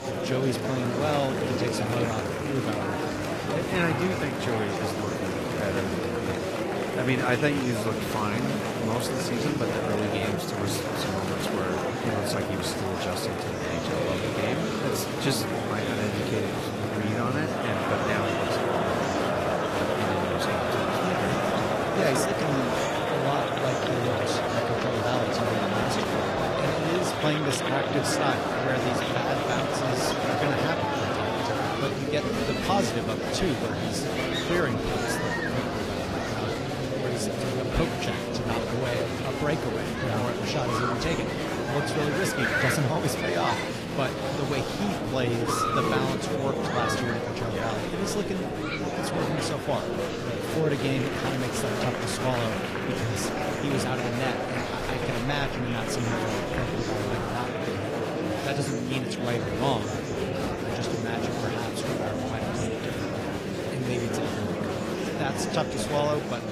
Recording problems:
garbled, watery; slightly
murmuring crowd; very loud; throughout; 3 dB above the speech
rain or running water; noticeable; throughout; 15 dB below the speech

